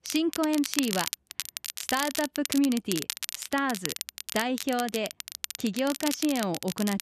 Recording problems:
crackle, like an old record; loud; 5 dB below the speech

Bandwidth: 14 kHz